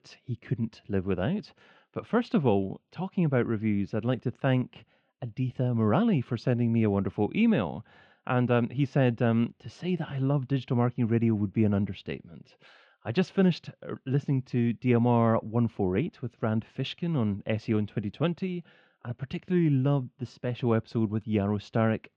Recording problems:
muffled; very; fading above 3 kHz

